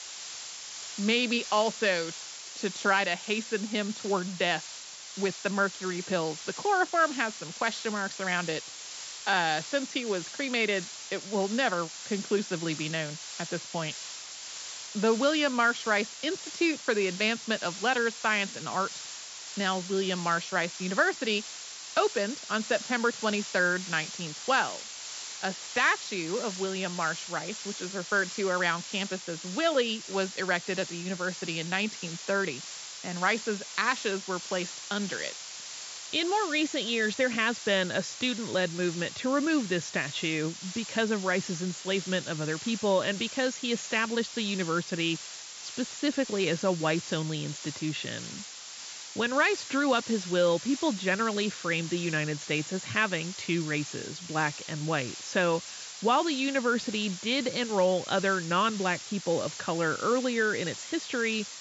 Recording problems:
high frequencies cut off; noticeable; nothing above 8 kHz
hiss; loud; throughout; 10 dB below the speech

